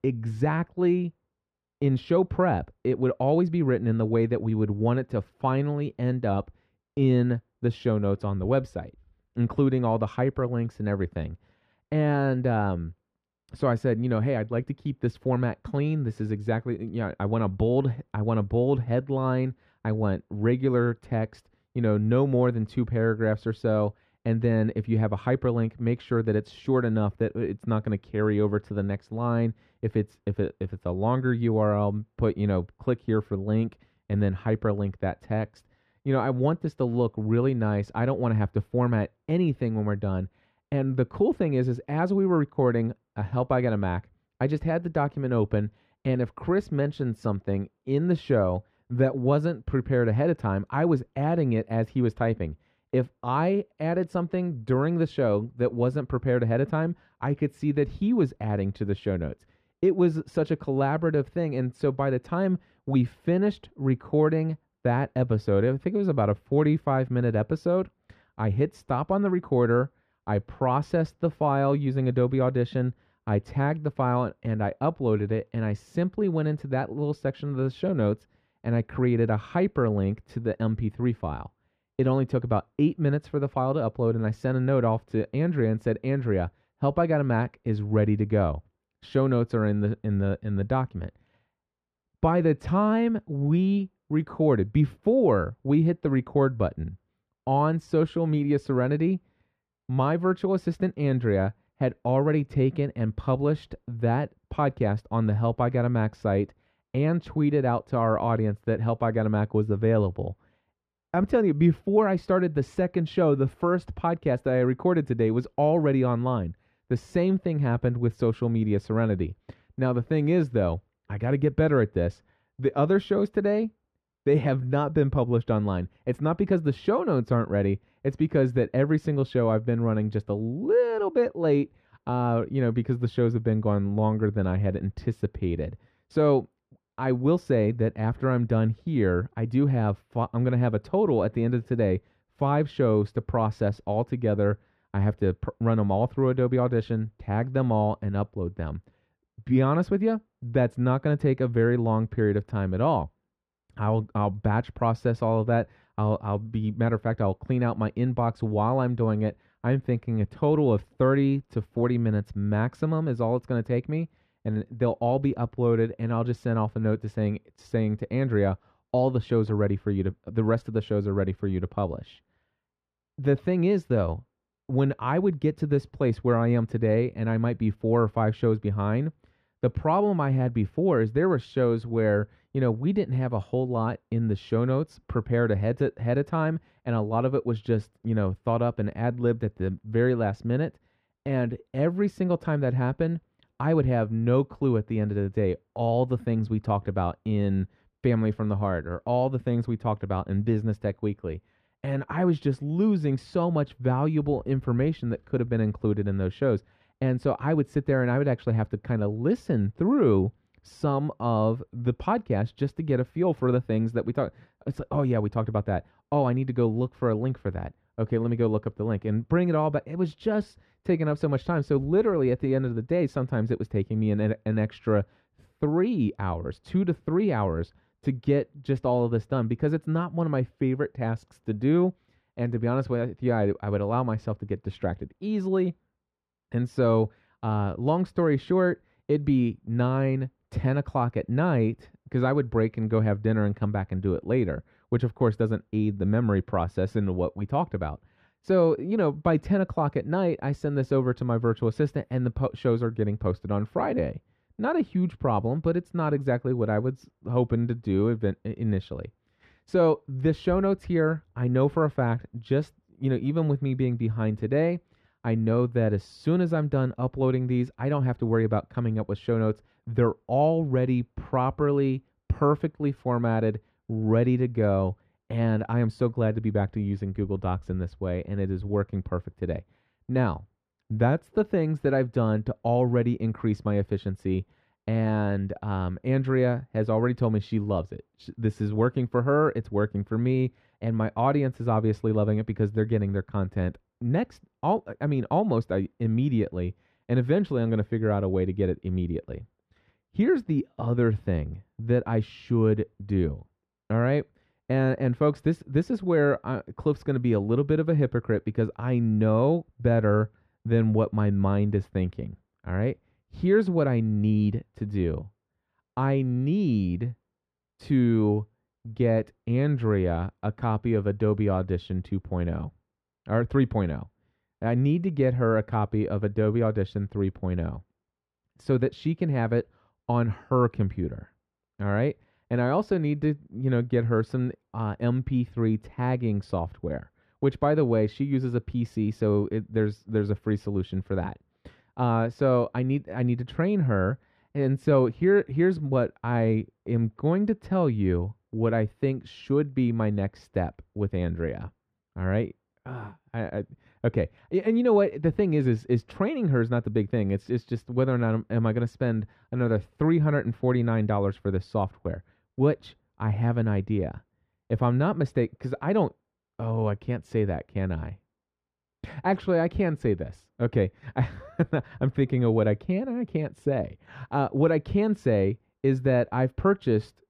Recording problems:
muffled; very; fading above 3.5 kHz

